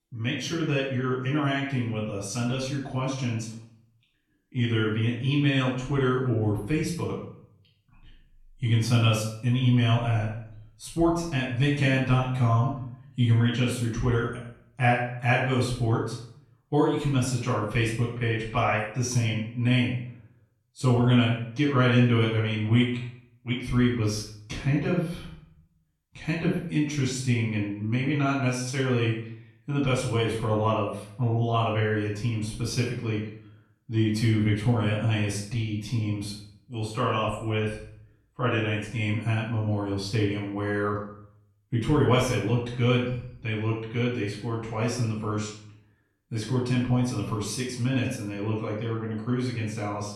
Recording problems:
off-mic speech; far
room echo; noticeable; dies away in 0.5 s

